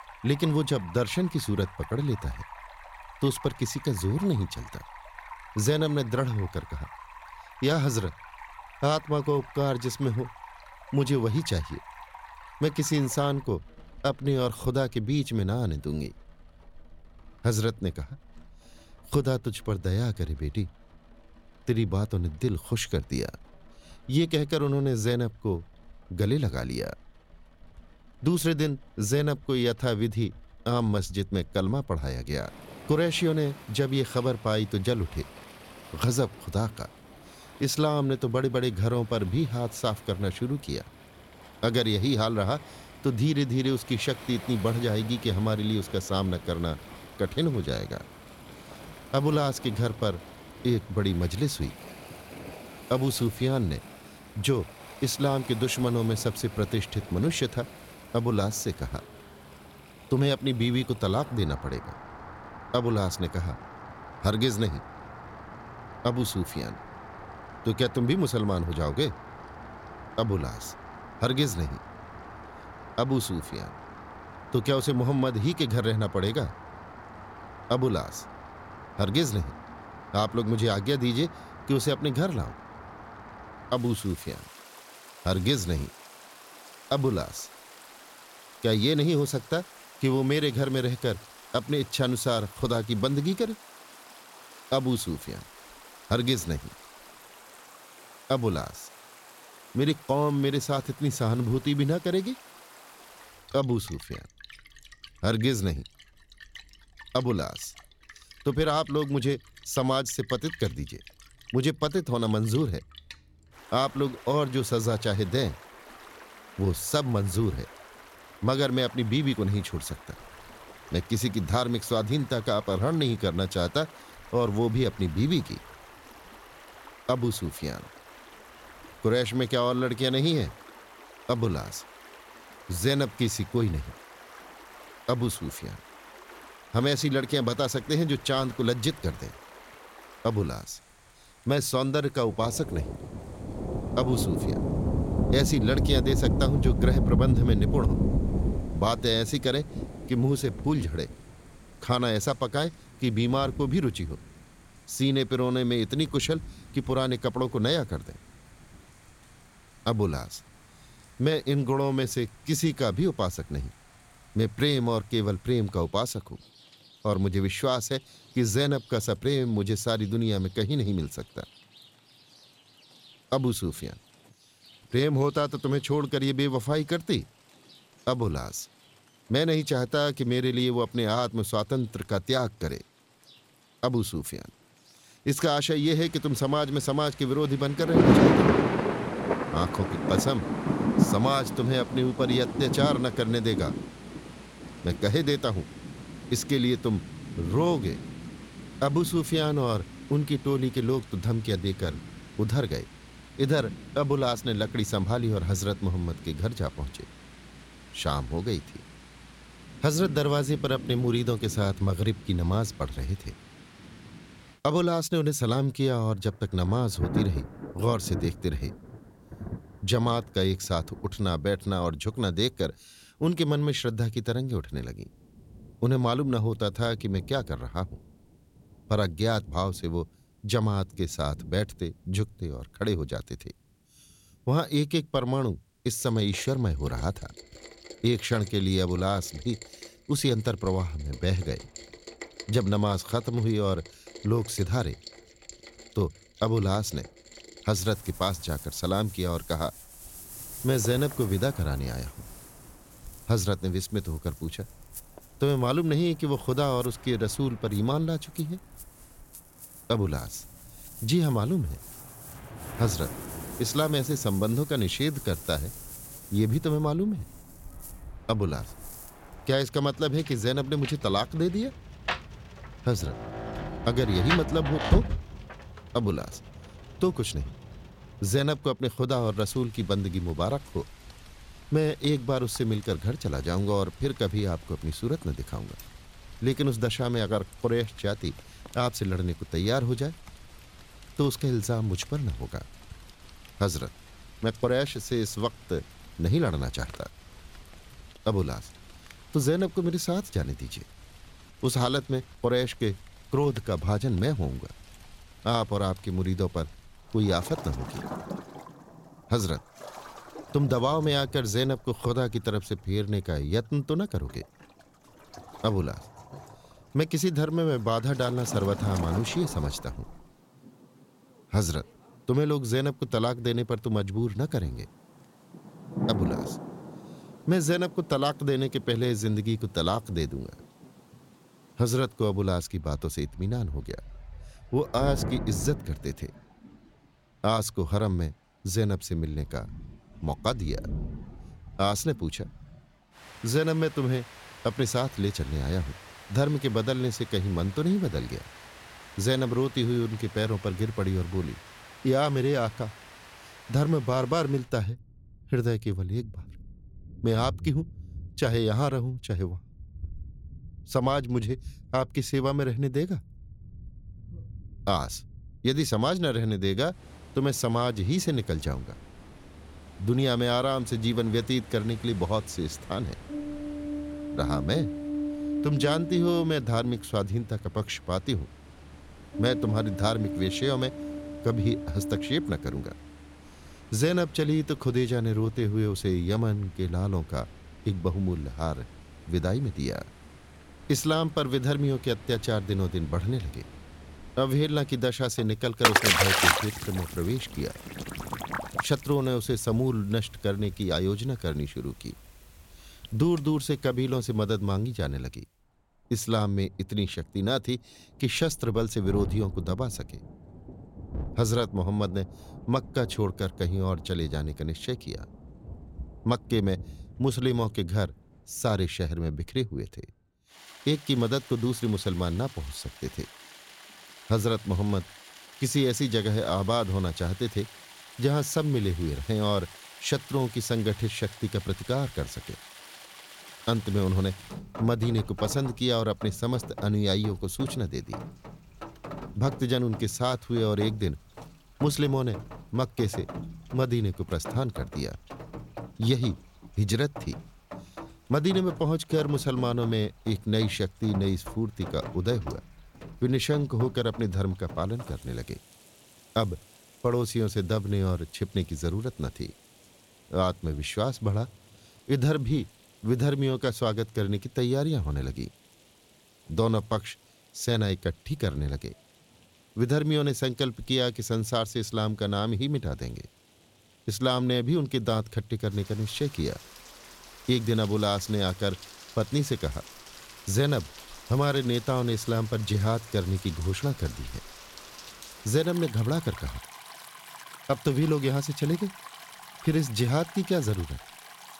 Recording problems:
rain or running water; loud; throughout; 10 dB below the speech

